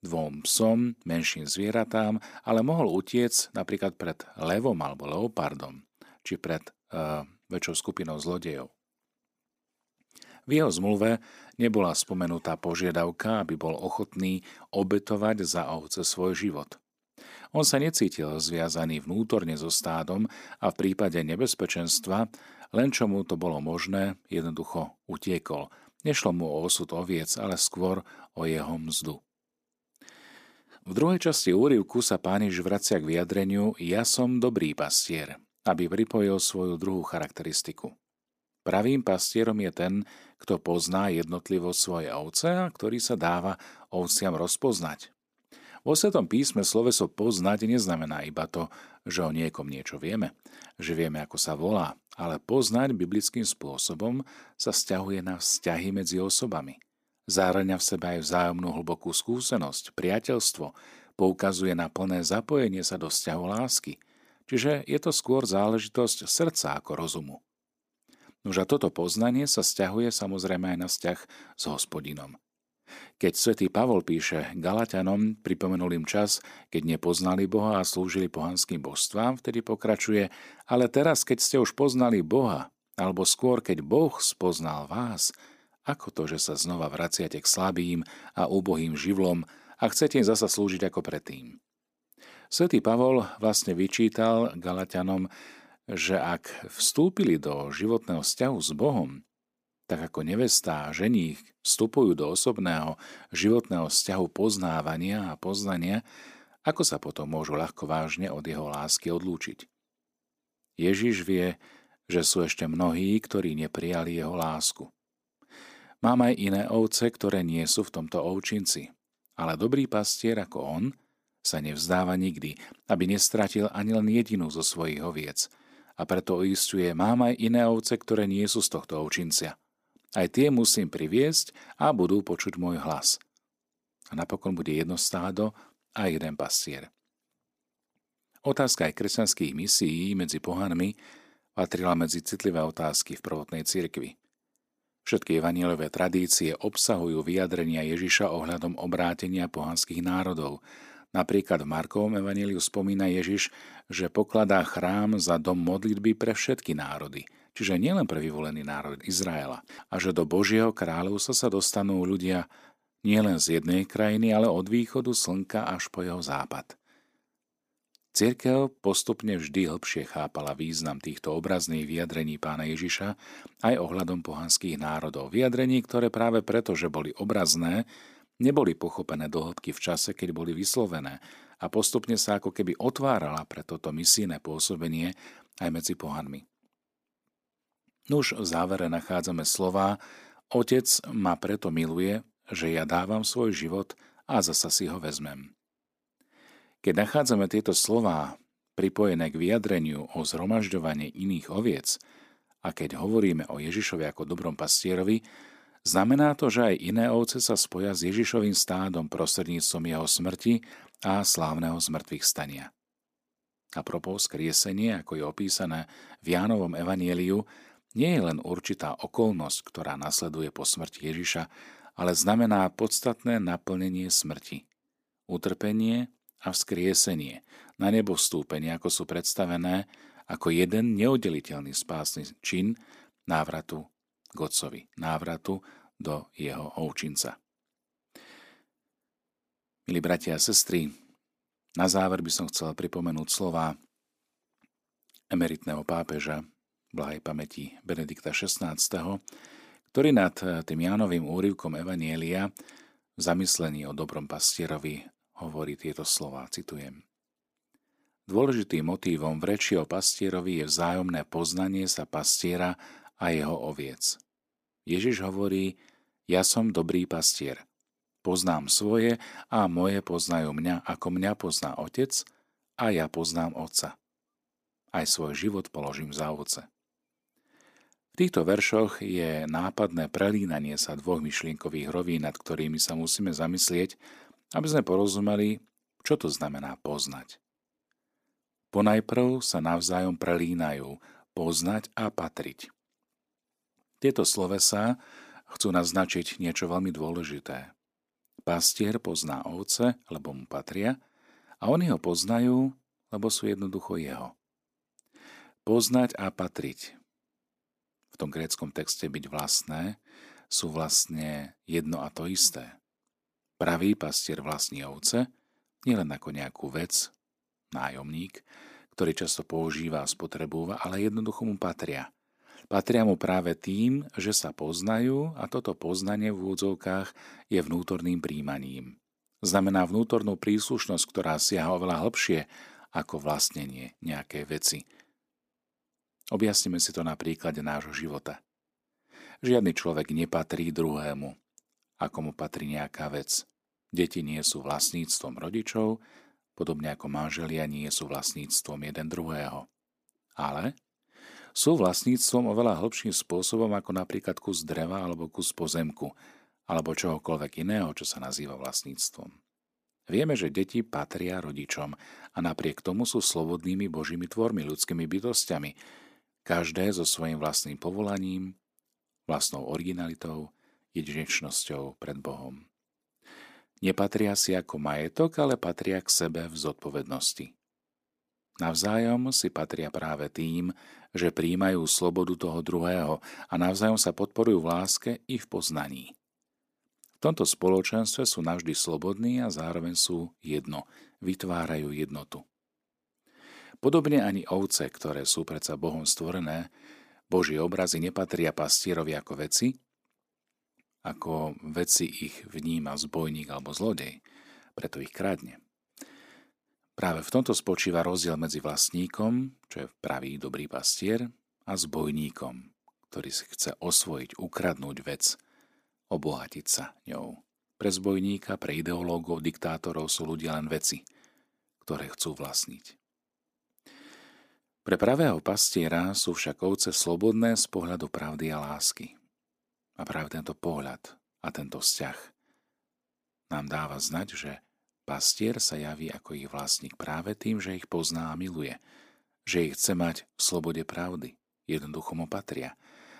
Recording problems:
none

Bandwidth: 15 kHz